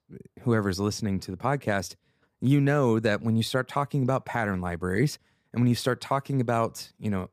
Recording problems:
none

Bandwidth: 14.5 kHz